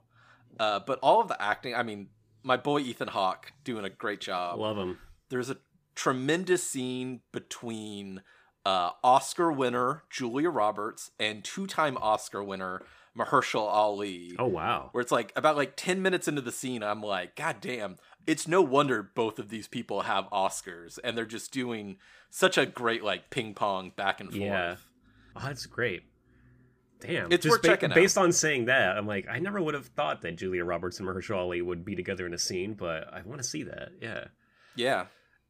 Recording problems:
none

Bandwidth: 15 kHz